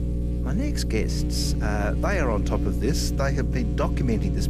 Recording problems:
electrical hum; loud; throughout; 60 Hz, 7 dB below the speech

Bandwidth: 14 kHz